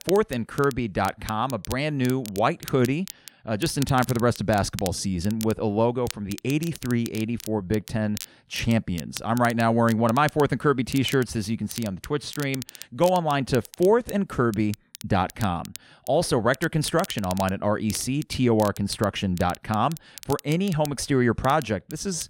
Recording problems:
crackle, like an old record; noticeable; 15 dB below the speech

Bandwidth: 16 kHz